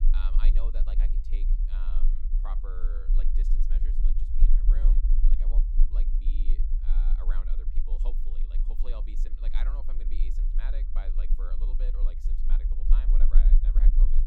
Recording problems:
low rumble; loud; throughout; 4 dB below the speech

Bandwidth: 17.5 kHz